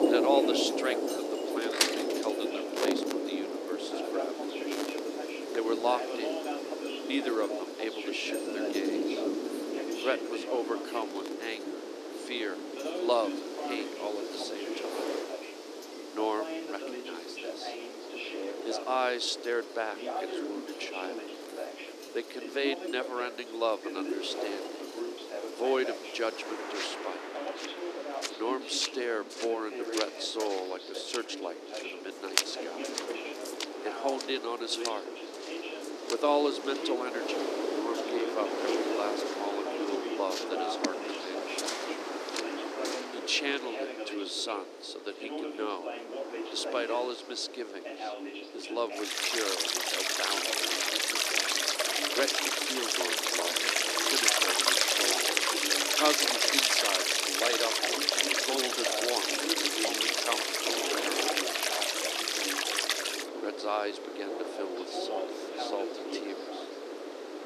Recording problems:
thin; somewhat; fading below 300 Hz
rain or running water; very loud; throughout; 5 dB above the speech
wind noise on the microphone; heavy; 8 dB below the speech
voice in the background; loud; throughout; 6 dB below the speech

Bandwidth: 14 kHz